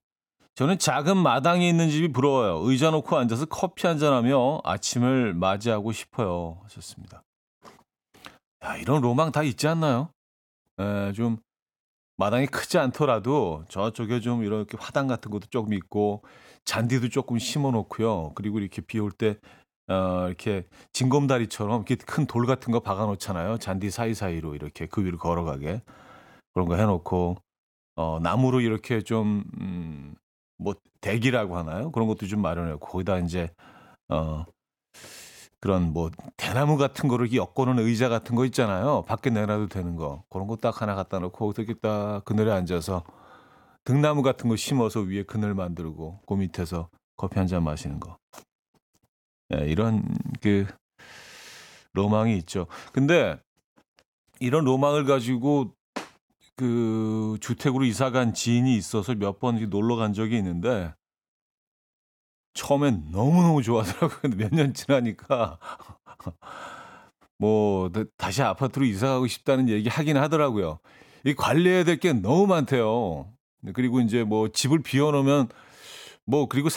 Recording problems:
abrupt cut into speech; at the end

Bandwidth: 17 kHz